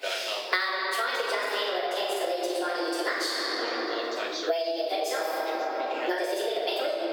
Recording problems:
room echo; strong; dies away in 2.8 s
off-mic speech; far
thin; very; fading below 350 Hz
wrong speed and pitch; too fast and too high; 1.5 times normal speed
squashed, flat; somewhat, background pumping
voice in the background; loud; throughout; 9 dB below the speech

